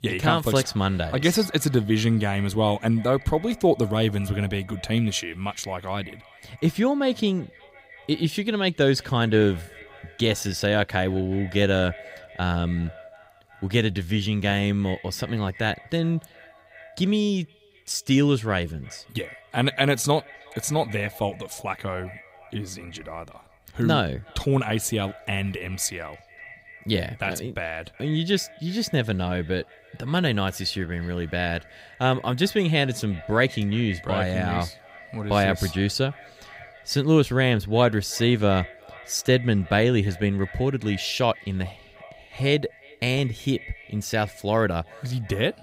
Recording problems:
echo of what is said; faint; throughout; 370 ms later, 20 dB below the speech

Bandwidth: 15.5 kHz